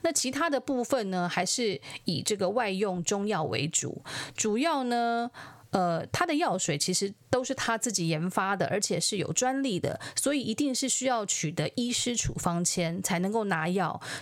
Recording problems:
squashed, flat; somewhat

